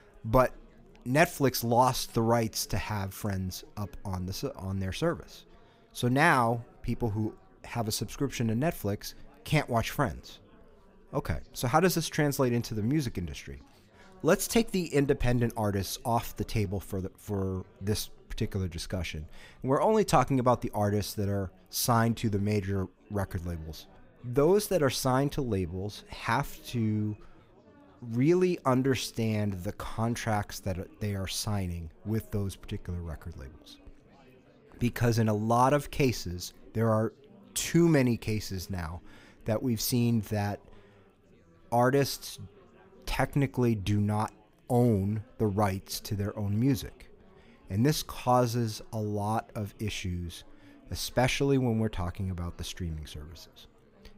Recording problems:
chatter from many people; faint; throughout; 30 dB below the speech

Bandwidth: 15.5 kHz